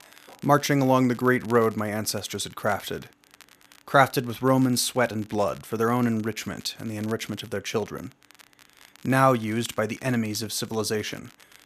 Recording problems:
crackle, like an old record; faint; 25 dB below the speech

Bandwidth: 14.5 kHz